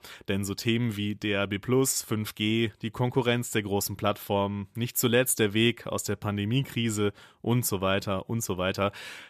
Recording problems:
none

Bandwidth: 14.5 kHz